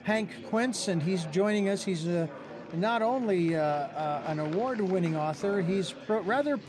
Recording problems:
murmuring crowd; noticeable; throughout; 15 dB below the speech

